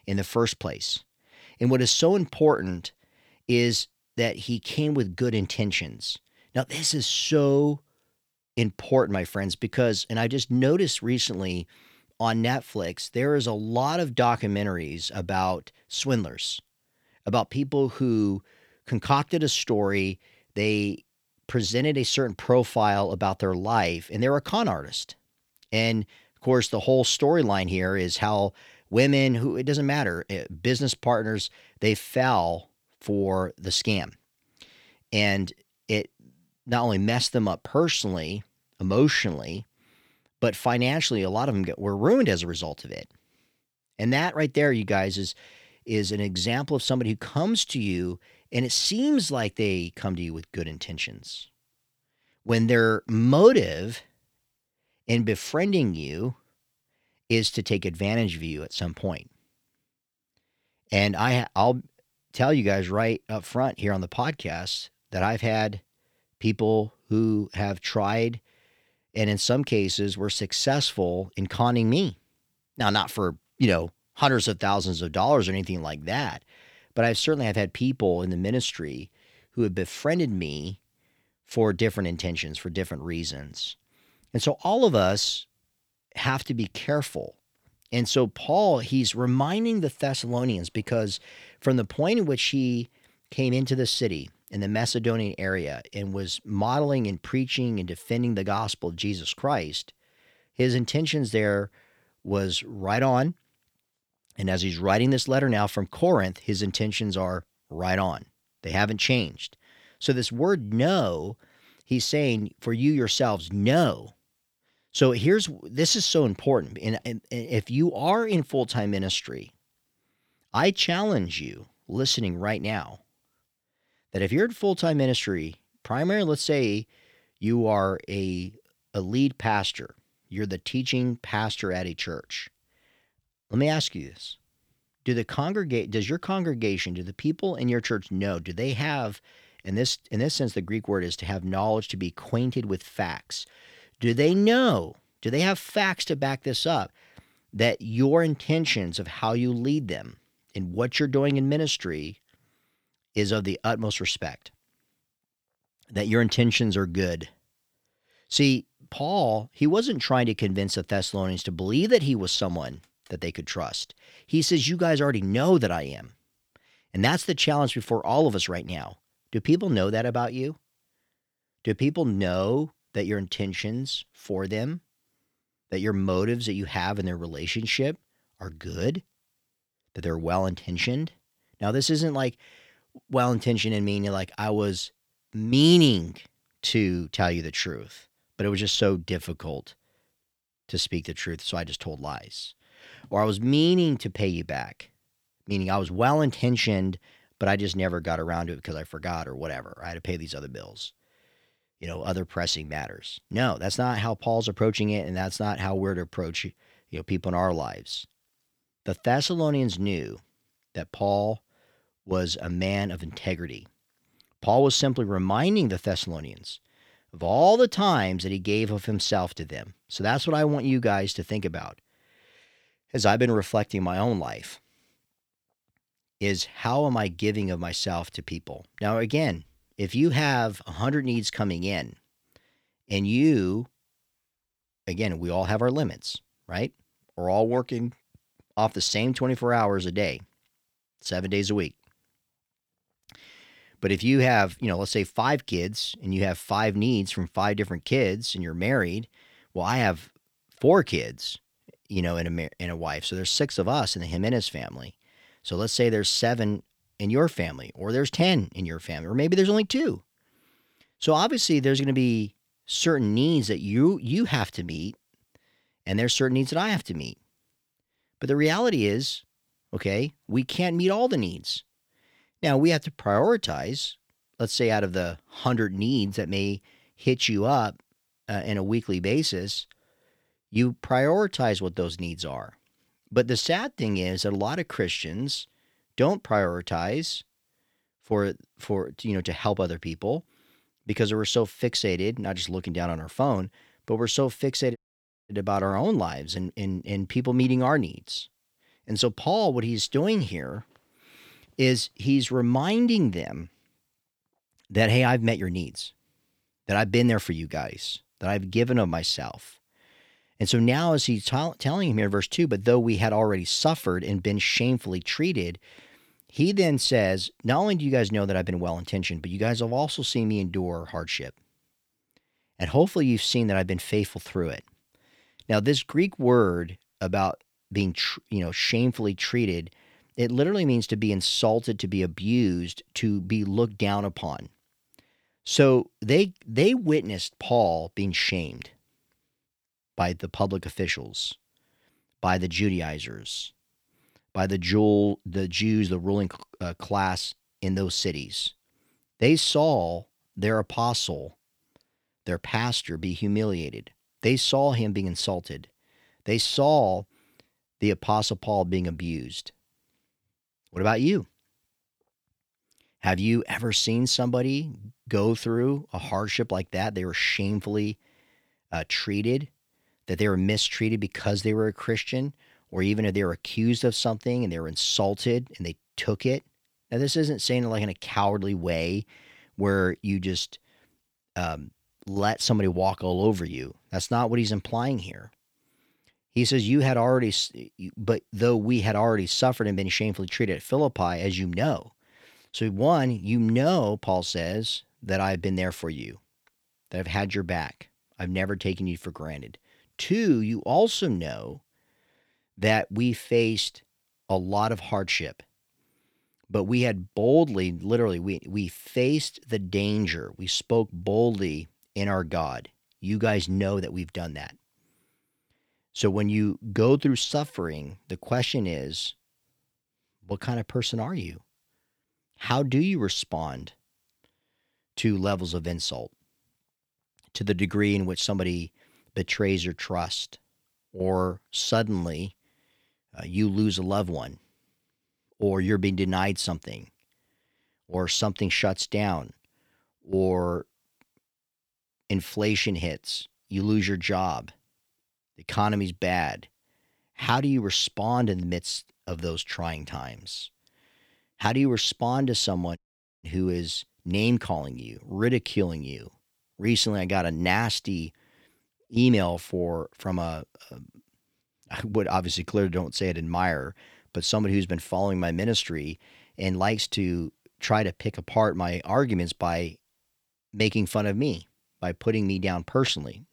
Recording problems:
audio cutting out; at 4:55 for 0.5 s and at 7:33

